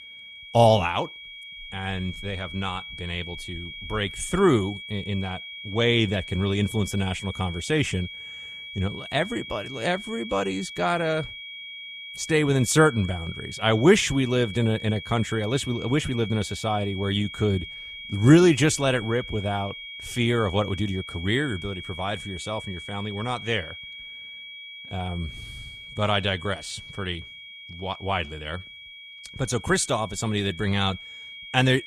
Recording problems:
high-pitched whine; noticeable; throughout; 2.5 kHz, 10 dB below the speech

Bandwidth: 13.5 kHz